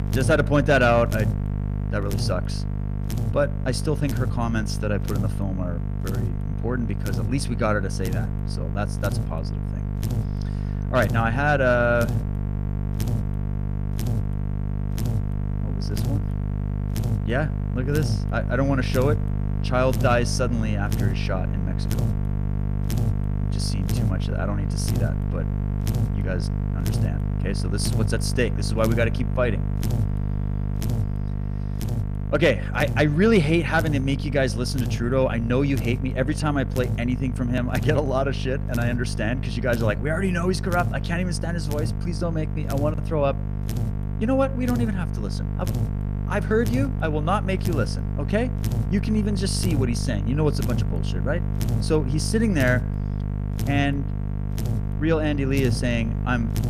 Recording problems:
electrical hum; noticeable; throughout; 50 Hz, 10 dB below the speech

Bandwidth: 15 kHz